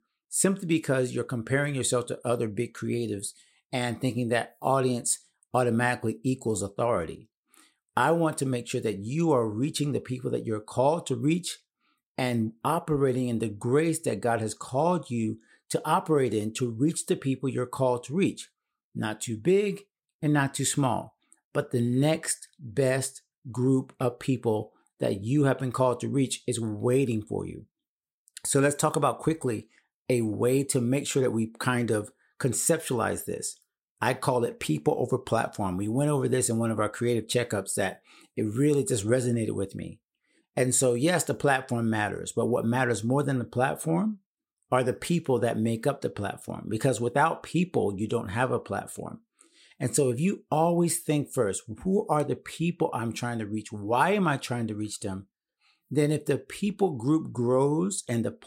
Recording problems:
none

